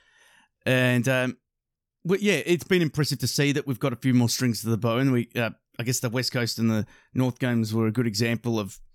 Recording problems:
none

